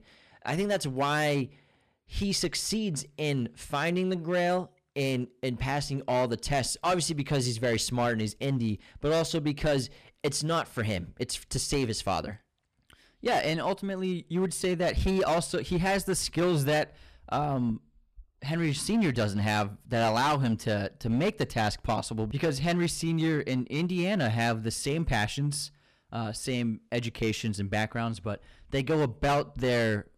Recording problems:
distortion; slight; 7% of the sound clipped

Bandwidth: 14.5 kHz